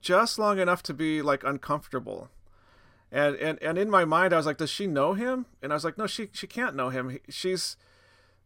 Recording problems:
none

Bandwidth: 16 kHz